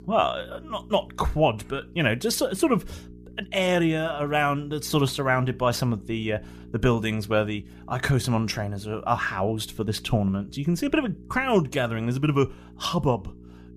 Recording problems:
electrical hum; faint; throughout; 60 Hz, 25 dB below the speech

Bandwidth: 14.5 kHz